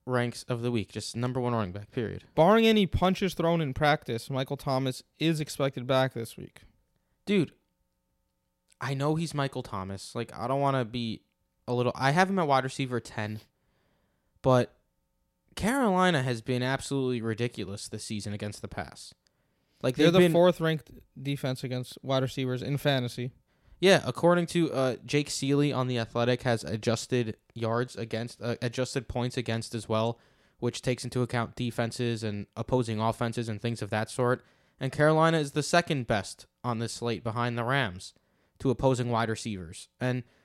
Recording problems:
none

